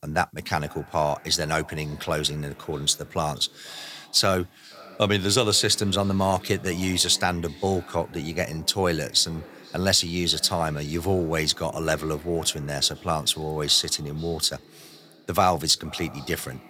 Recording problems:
echo of what is said; faint; throughout; 480 ms later, 20 dB below the speech

